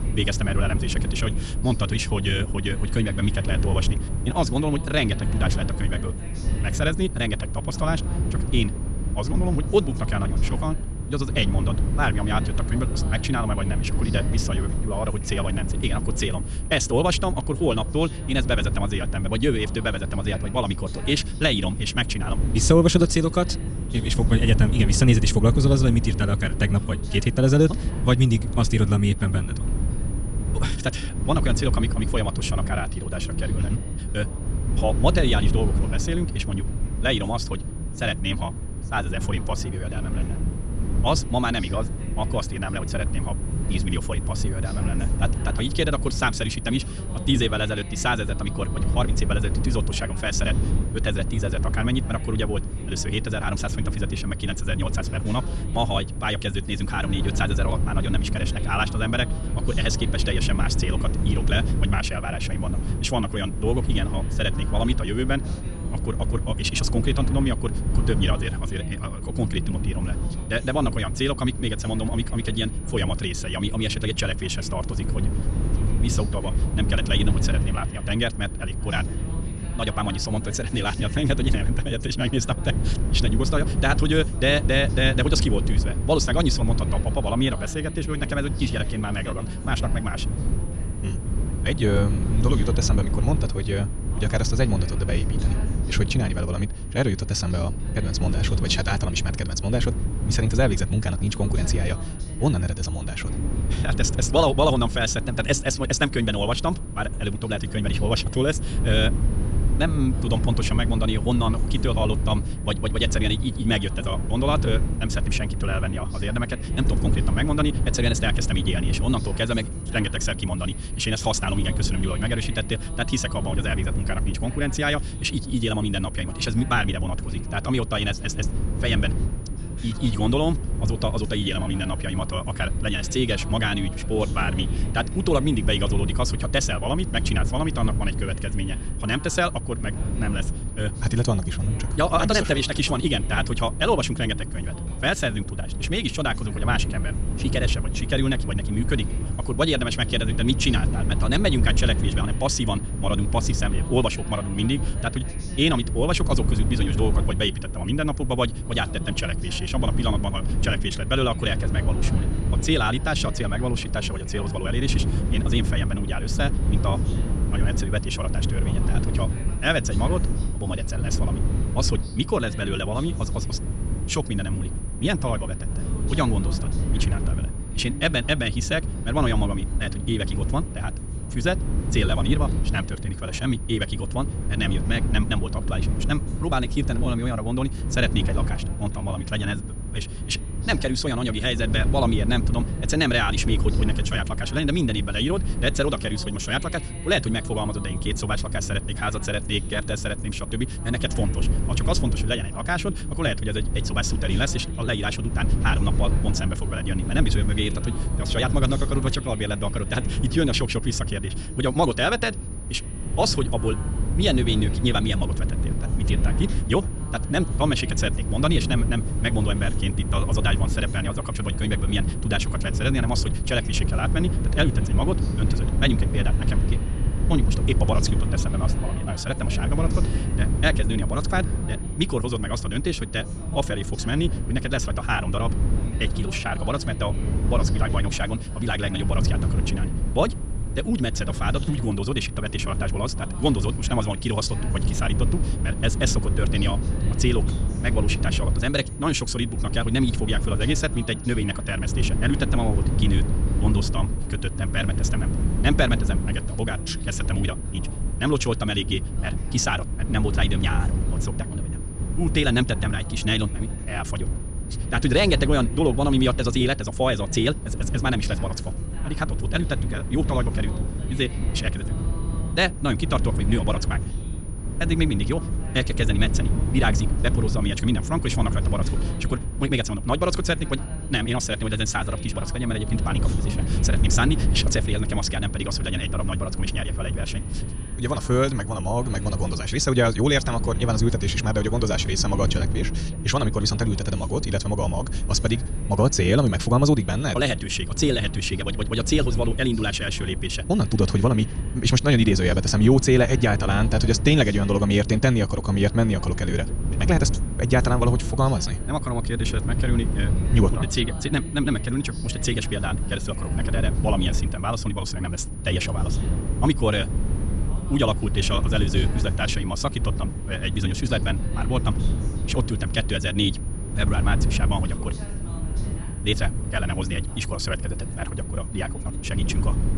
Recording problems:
wrong speed, natural pitch; too fast; 1.6 times normal speed
high-pitched whine; noticeable; throughout; 9.5 kHz, 20 dB below the speech
voice in the background; noticeable; throughout; 15 dB below the speech
wind noise on the microphone; occasional gusts; 10 dB below the speech

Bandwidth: 14.5 kHz